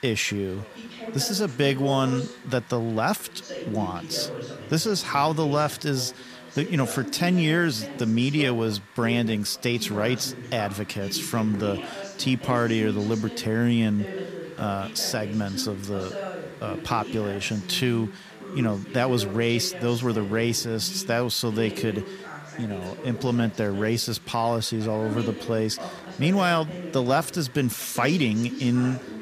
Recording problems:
background chatter; noticeable; throughout; 3 voices, 10 dB below the speech
hiss; faint; throughout; 25 dB below the speech

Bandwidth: 14.5 kHz